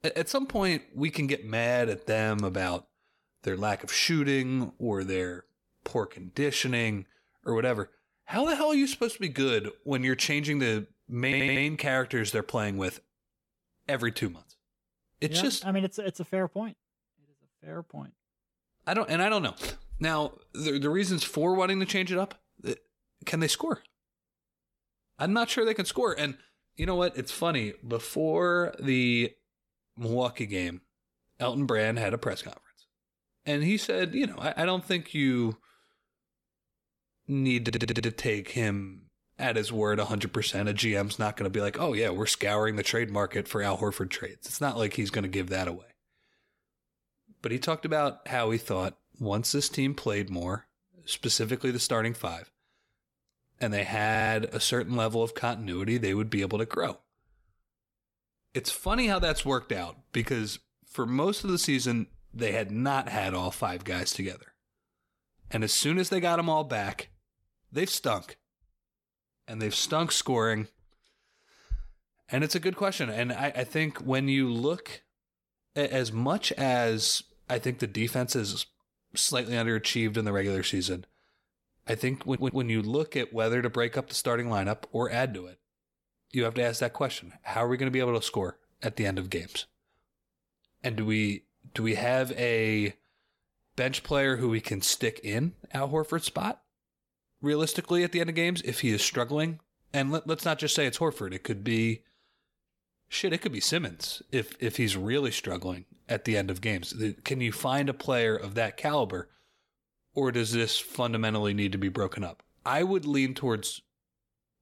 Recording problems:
audio stuttering; 4 times, first at 11 s

